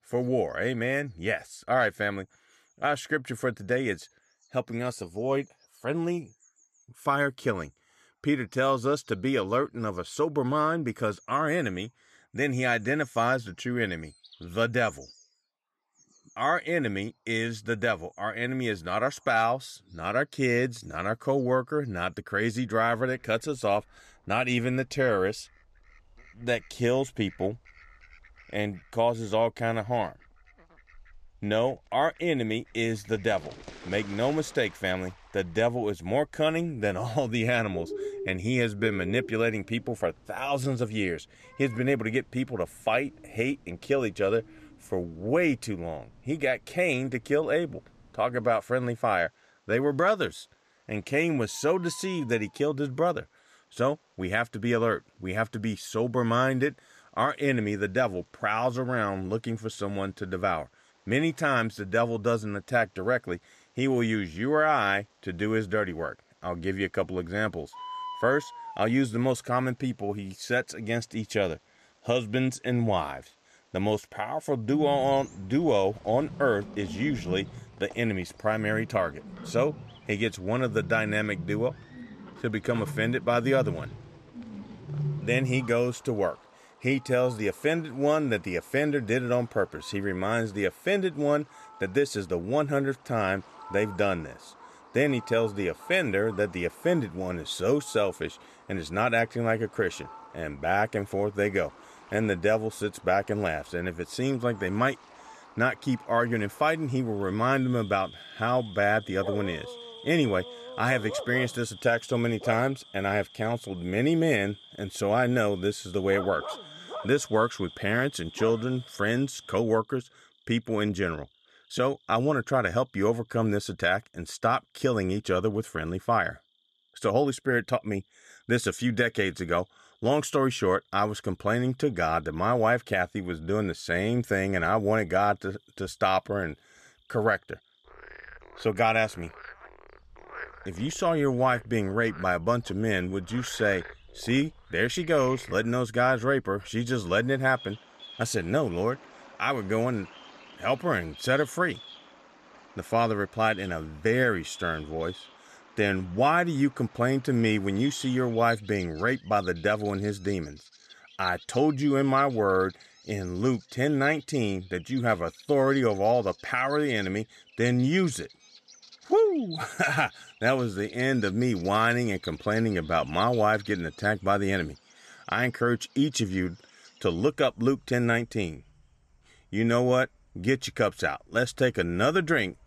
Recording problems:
animal sounds; noticeable; throughout; 15 dB below the speech

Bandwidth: 14 kHz